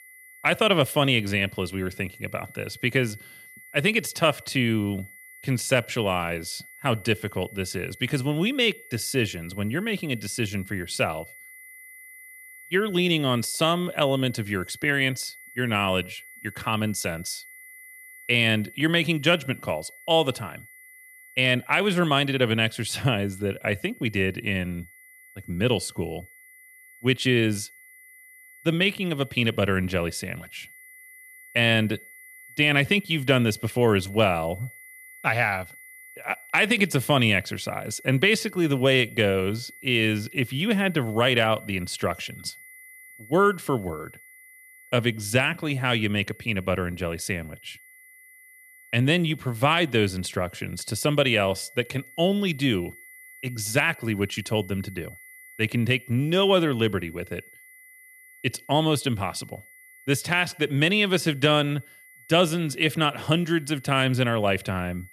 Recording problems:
high-pitched whine; faint; throughout; 2 kHz, 20 dB below the speech

